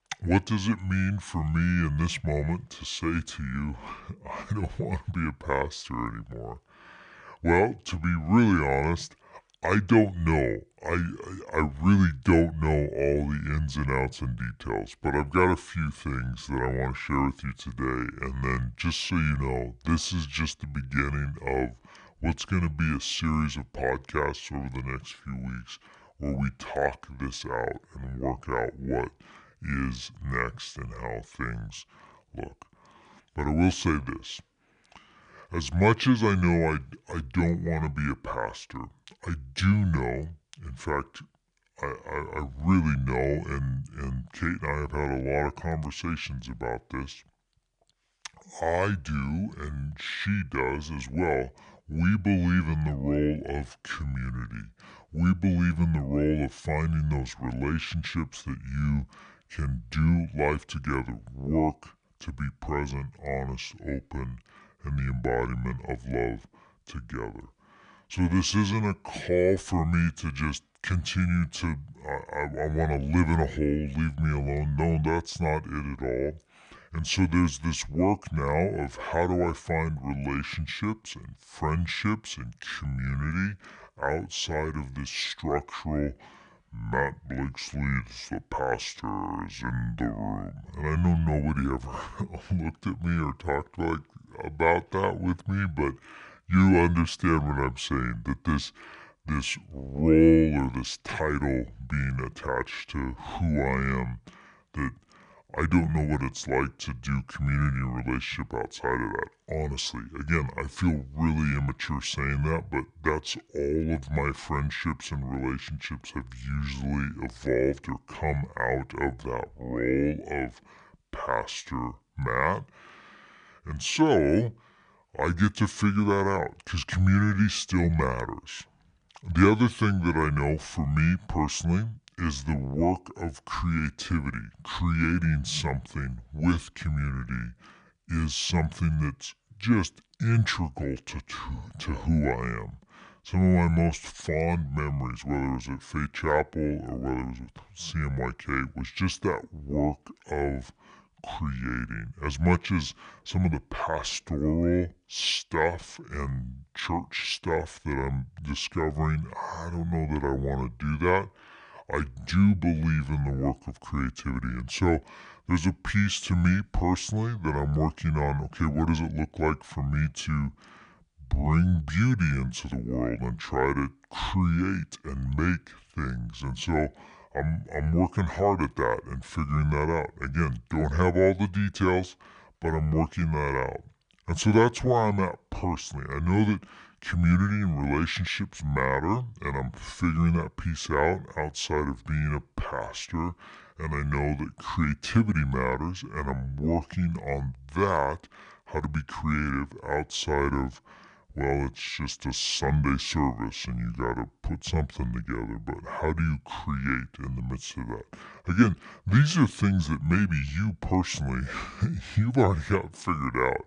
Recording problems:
wrong speed and pitch; too slow and too low; 0.7 times normal speed

